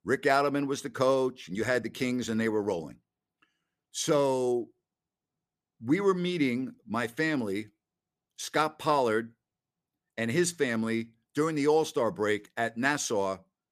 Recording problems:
none

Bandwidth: 14.5 kHz